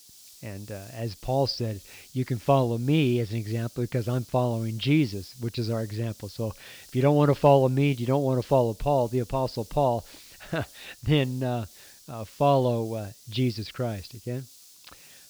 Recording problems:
high frequencies cut off; noticeable; nothing above 5.5 kHz
hiss; faint; throughout; 20 dB below the speech

